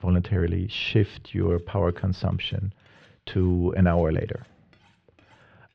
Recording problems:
muffled; very; fading above 3 kHz
clattering dishes; very faint; from 1 s on; peak 35 dB below the speech

